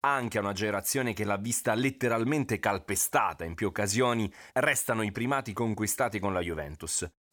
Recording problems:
none

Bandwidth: 18.5 kHz